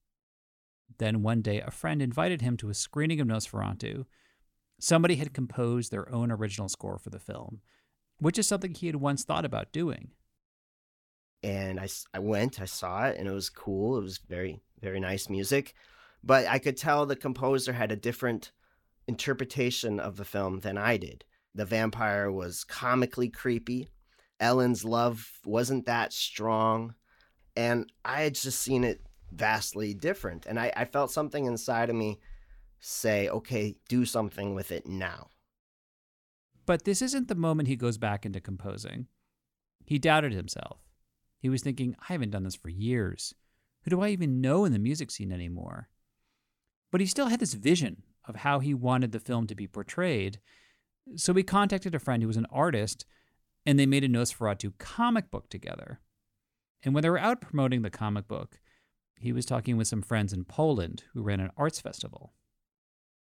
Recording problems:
none

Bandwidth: 17.5 kHz